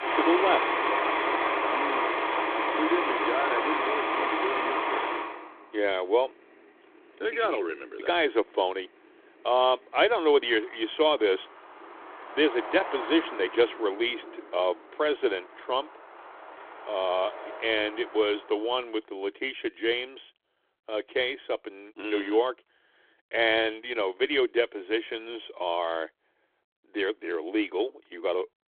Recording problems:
phone-call audio; nothing above 3.5 kHz
traffic noise; very loud; until 19 s; as loud as the speech

